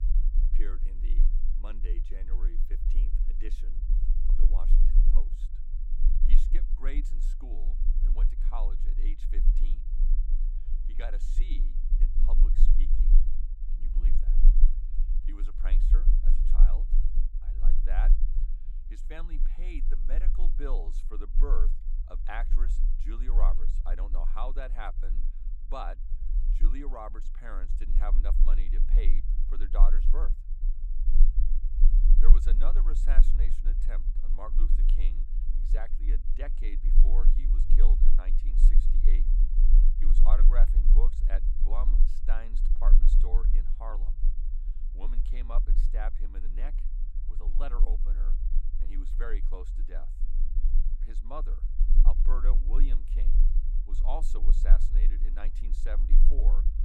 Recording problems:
low rumble; noticeable; throughout; 10 dB below the speech

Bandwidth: 16.5 kHz